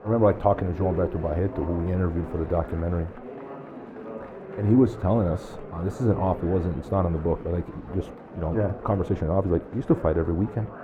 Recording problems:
muffled; very; fading above 2.5 kHz
murmuring crowd; noticeable; throughout; 15 dB below the speech

